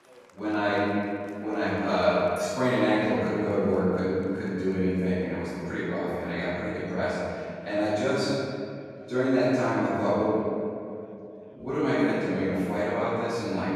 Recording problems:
room echo; strong; dies away in 2.5 s
off-mic speech; far
chatter from many people; faint; throughout; 30 dB below the speech

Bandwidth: 14.5 kHz